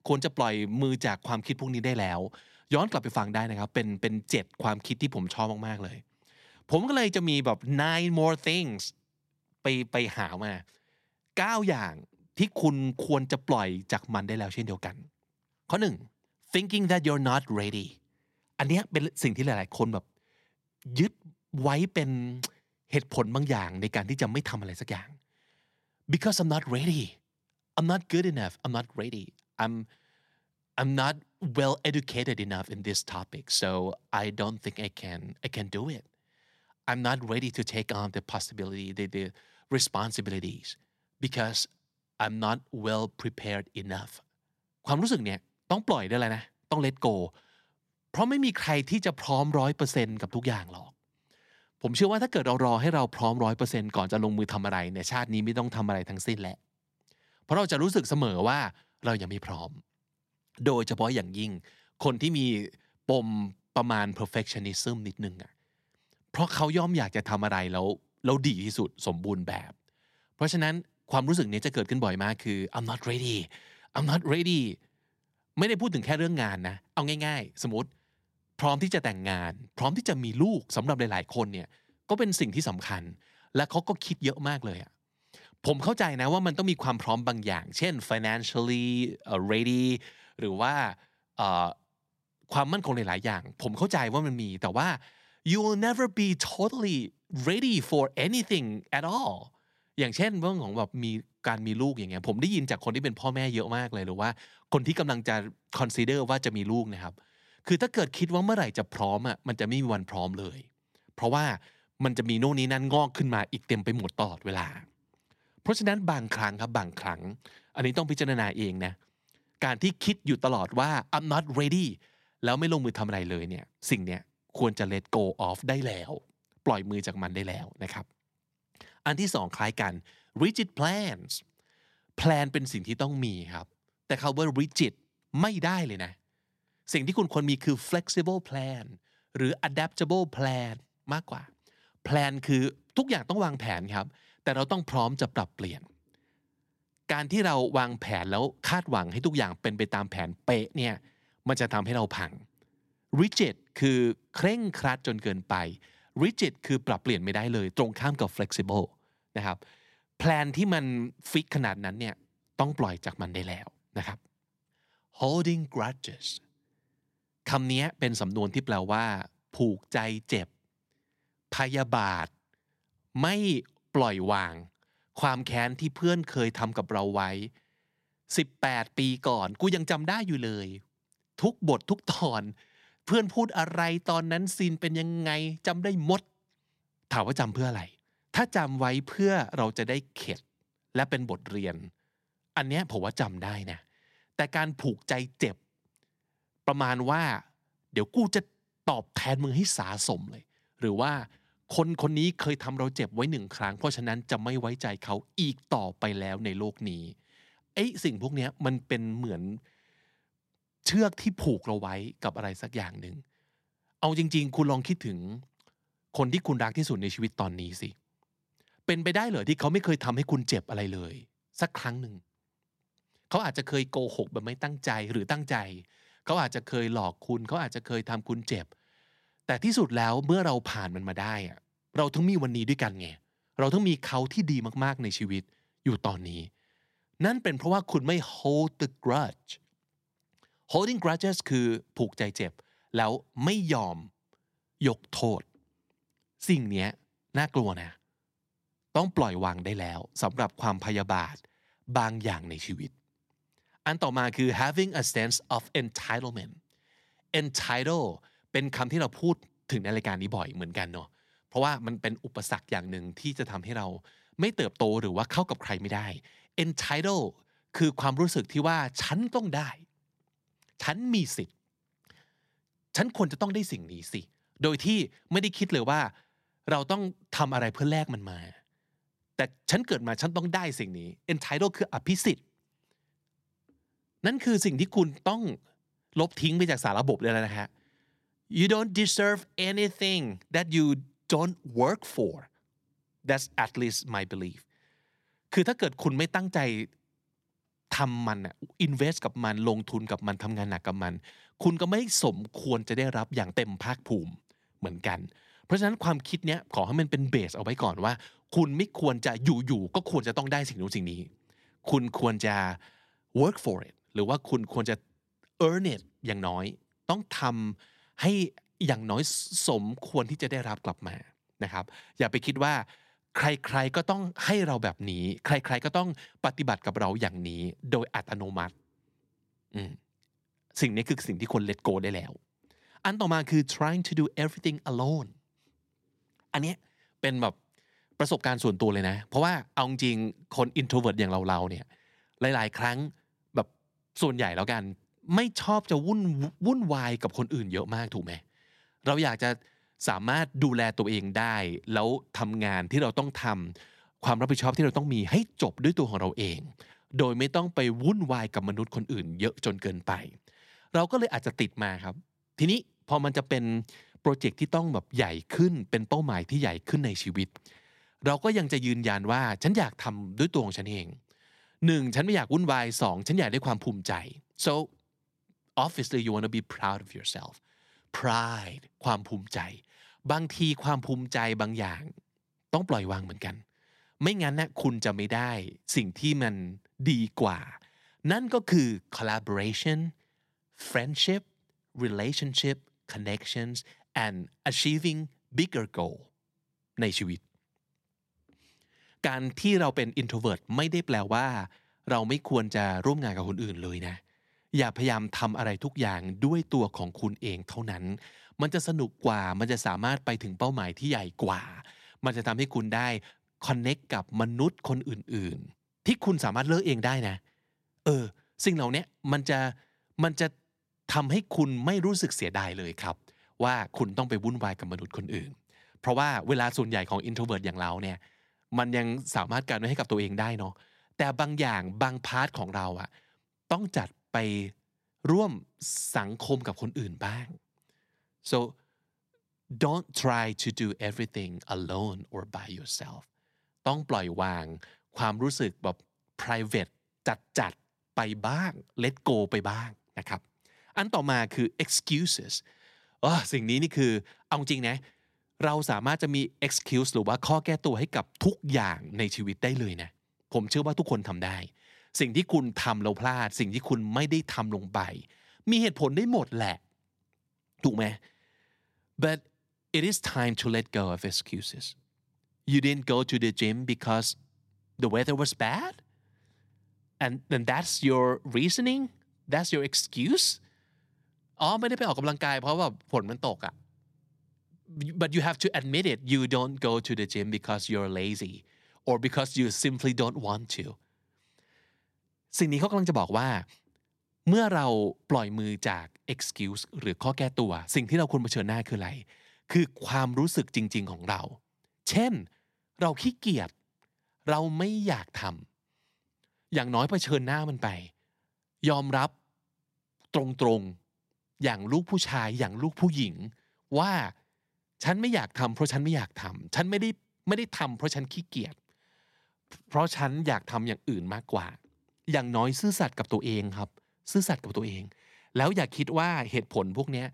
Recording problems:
none

